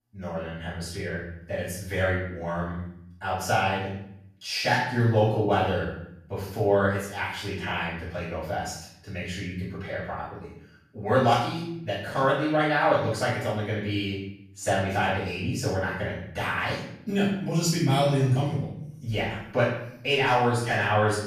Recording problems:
off-mic speech; far
room echo; noticeable; dies away in 0.7 s

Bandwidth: 14.5 kHz